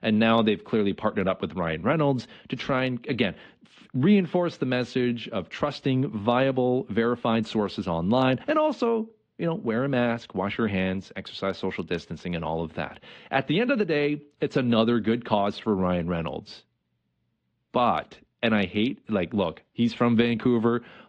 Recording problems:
muffled; slightly; fading above 3.5 kHz
garbled, watery; slightly

